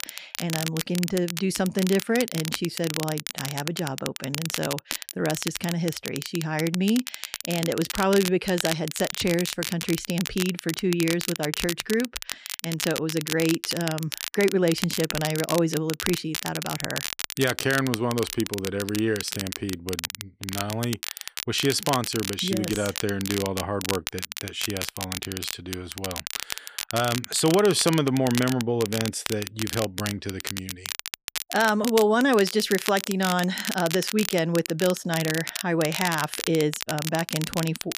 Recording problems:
crackle, like an old record; loud; 6 dB below the speech

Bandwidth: 15 kHz